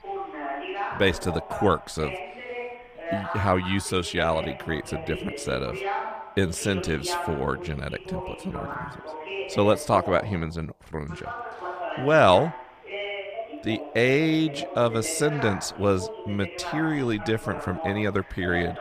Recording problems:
voice in the background; loud; throughout; 9 dB below the speech

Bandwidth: 15 kHz